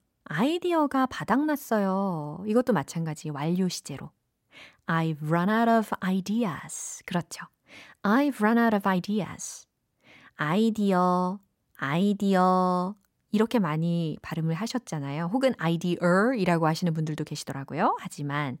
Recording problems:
none

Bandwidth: 16 kHz